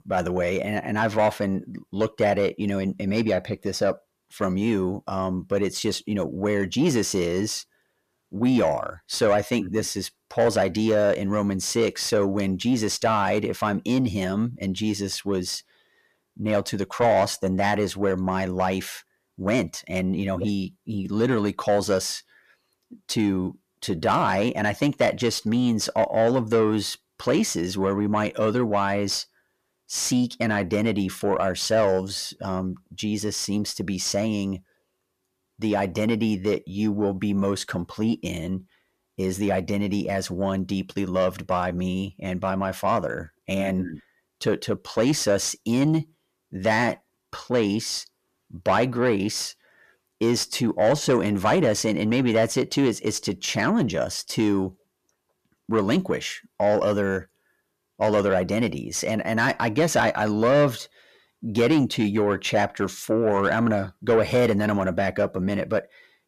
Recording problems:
distortion; slight; 10 dB below the speech

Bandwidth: 14.5 kHz